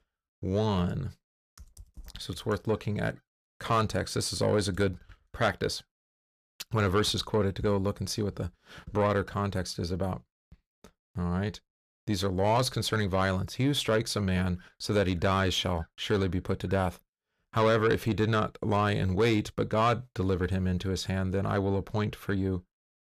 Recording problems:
distortion; slight; 10 dB below the speech

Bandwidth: 14.5 kHz